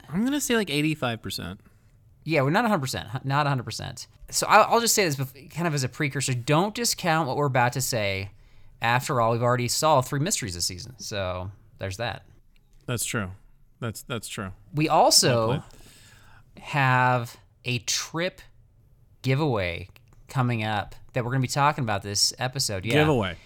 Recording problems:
none

